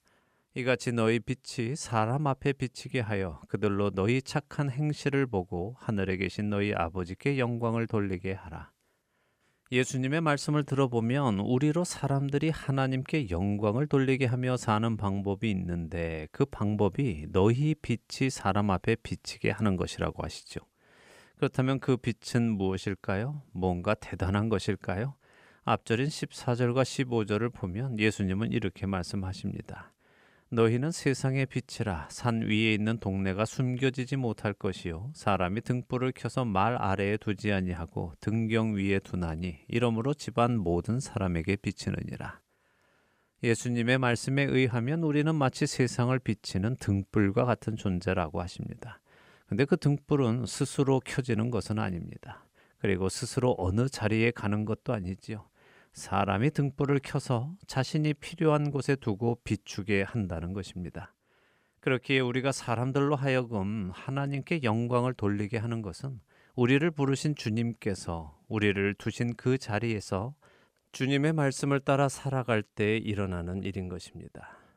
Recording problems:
none

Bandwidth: 15.5 kHz